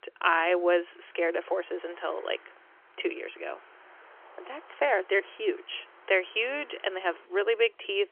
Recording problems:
phone-call audio; nothing above 3 kHz
traffic noise; faint; throughout; 25 dB below the speech

